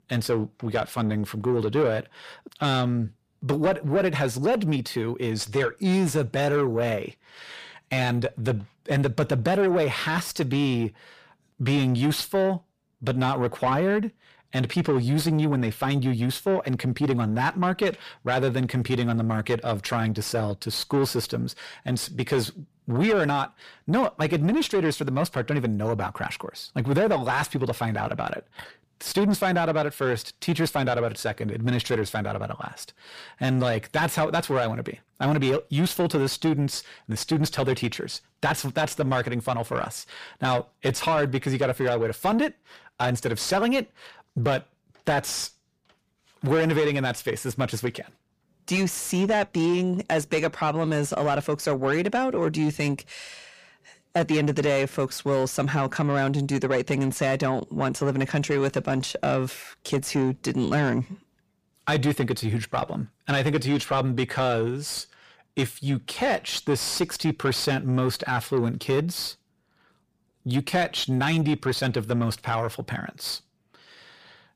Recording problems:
distortion; slight; 10 dB below the speech

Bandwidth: 15 kHz